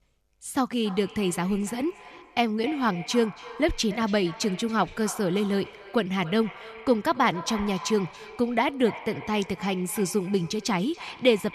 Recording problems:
echo of what is said; noticeable; throughout; 280 ms later, 15 dB below the speech

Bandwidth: 13.5 kHz